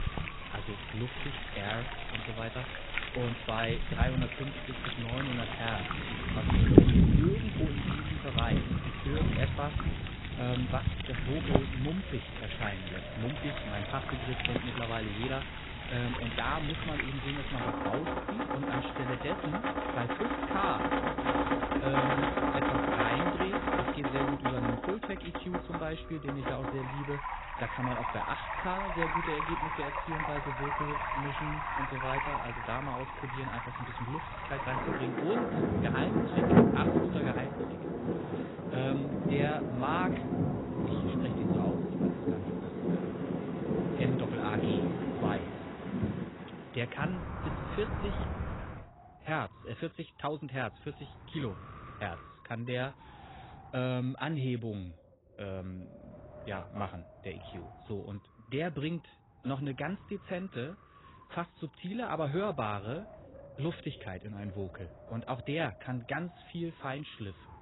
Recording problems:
garbled, watery; badly; nothing above 4 kHz
rain or running water; very loud; until 49 s; 5 dB above the speech
wind noise on the microphone; occasional gusts; 15 dB below the speech
crackling; faint; from 33 to 36 s; 25 dB below the speech

